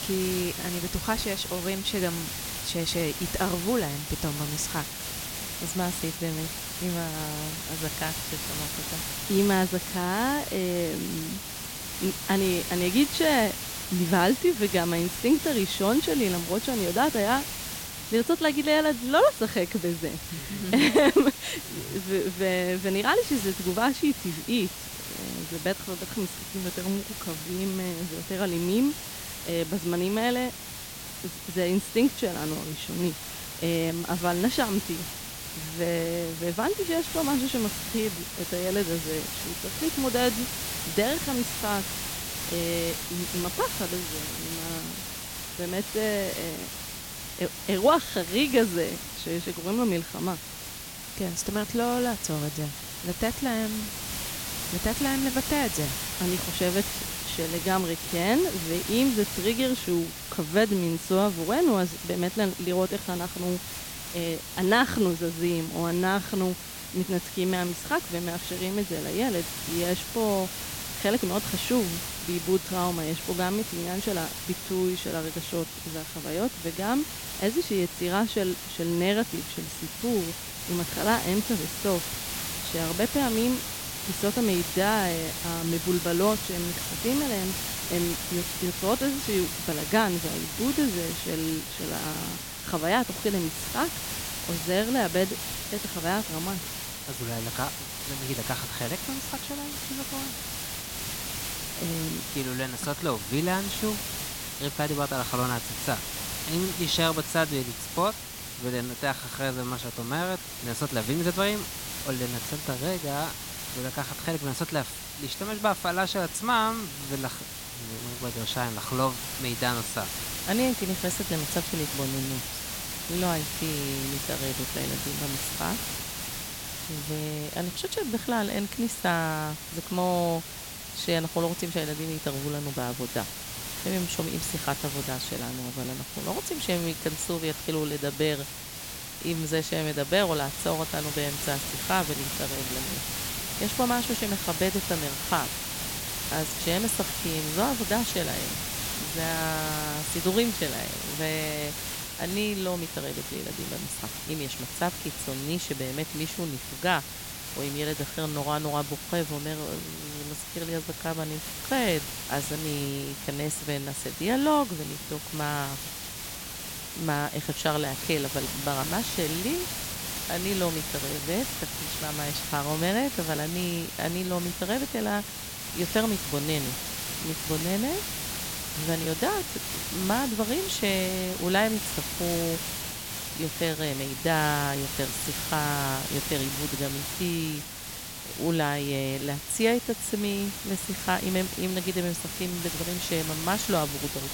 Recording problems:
hiss; loud; throughout; 4 dB below the speech

